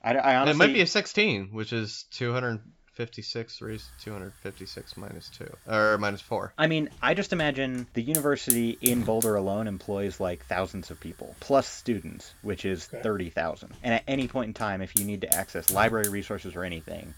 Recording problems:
high frequencies cut off; noticeable; nothing above 8 kHz
hiss; loud; from 3.5 s on; as loud as the speech

